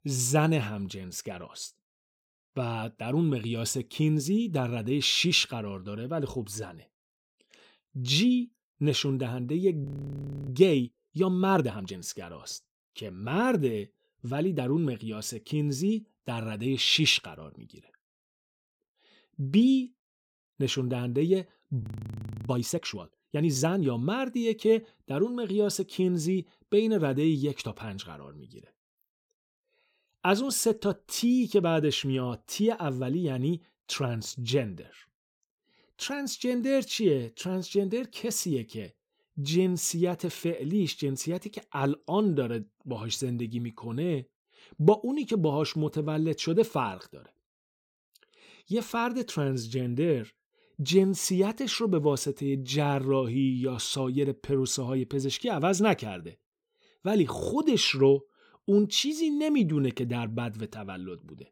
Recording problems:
audio freezing; at 10 s for 0.5 s and at 22 s for 0.5 s

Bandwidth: 17.5 kHz